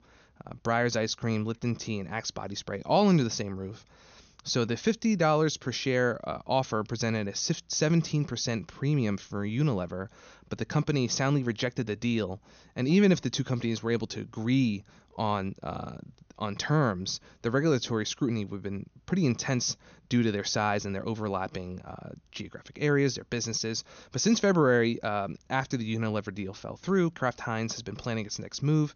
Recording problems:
high frequencies cut off; noticeable; nothing above 6.5 kHz

